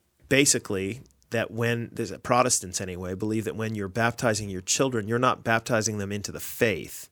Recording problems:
none

